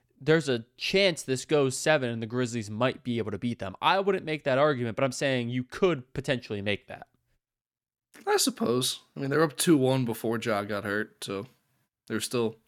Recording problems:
none

